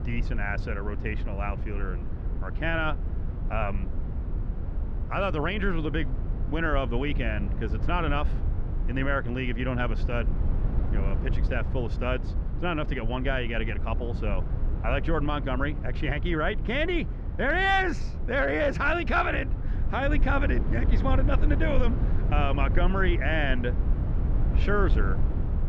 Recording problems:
muffled; slightly; fading above 3 kHz
low rumble; noticeable; throughout; 15 dB below the speech

